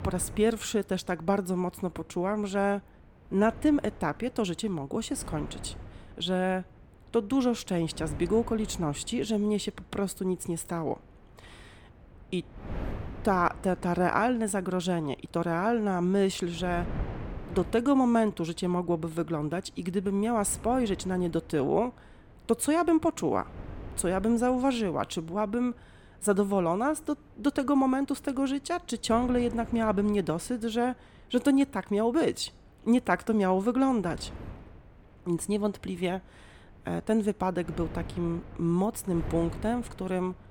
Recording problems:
wind noise on the microphone; occasional gusts; 20 dB below the speech

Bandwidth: 17.5 kHz